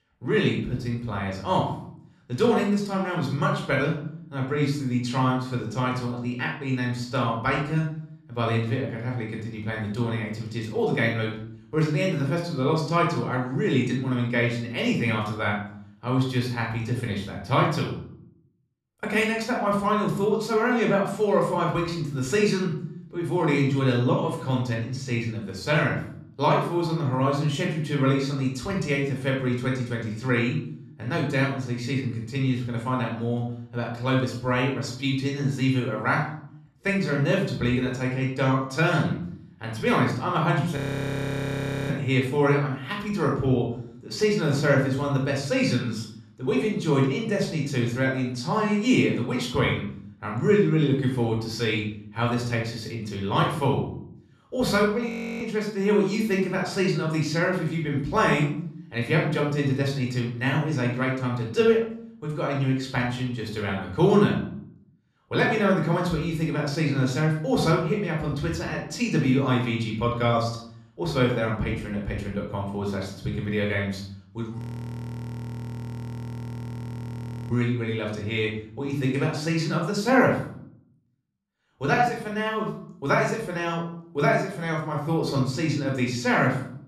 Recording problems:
room echo; noticeable; dies away in 0.6 s
off-mic speech; somewhat distant
audio freezing; at 41 s for 1 s, at 55 s and at 1:15 for 3 s

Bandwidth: 13.5 kHz